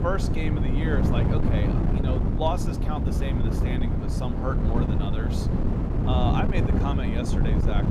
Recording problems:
wind noise on the microphone; heavy; as loud as the speech

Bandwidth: 15 kHz